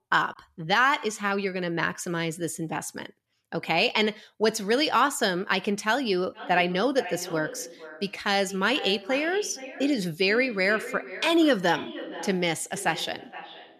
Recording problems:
echo of what is said; noticeable; from 6.5 s on; 470 ms later, 15 dB below the speech

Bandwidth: 13.5 kHz